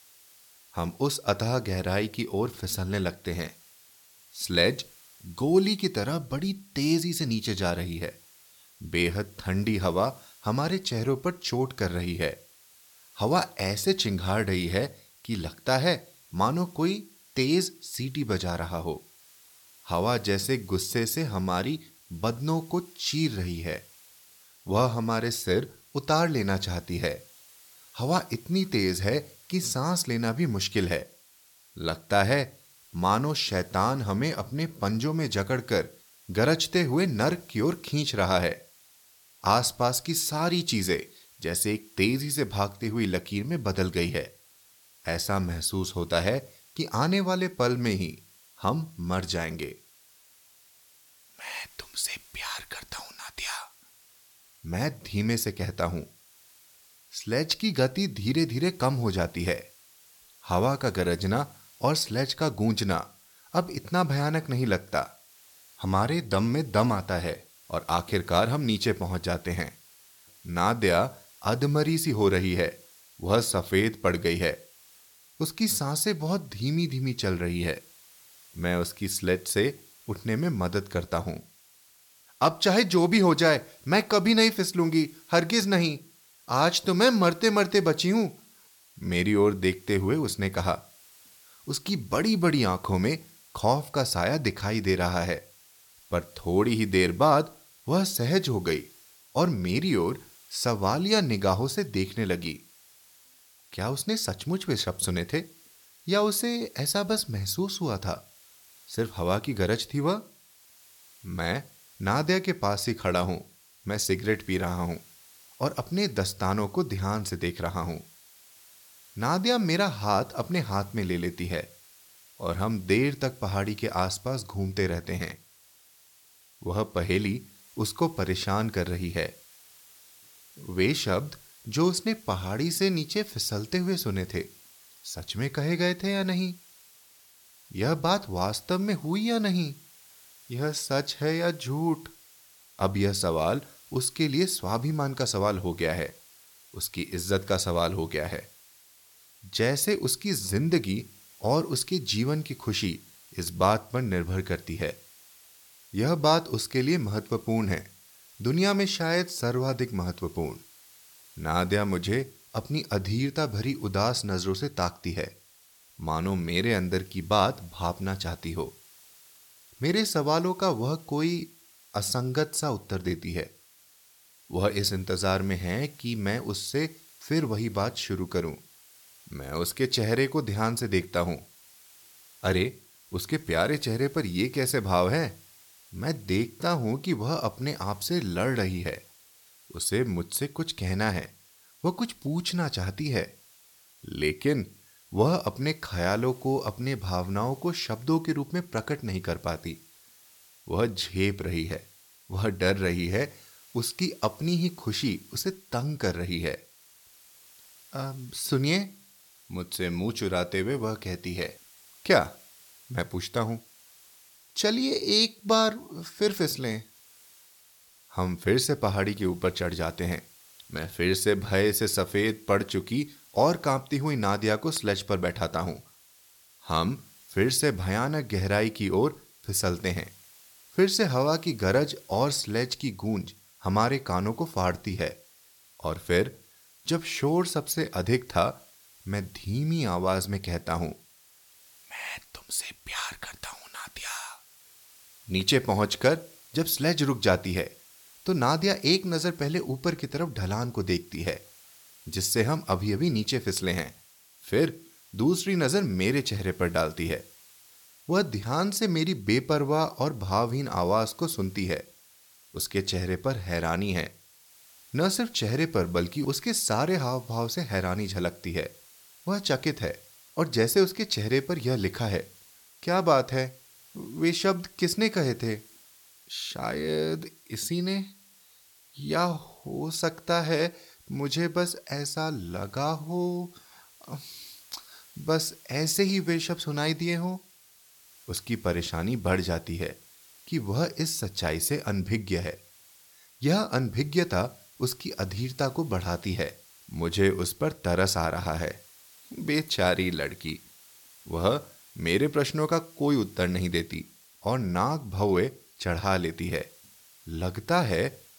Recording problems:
hiss; faint; throughout; 25 dB below the speech

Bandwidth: 17.5 kHz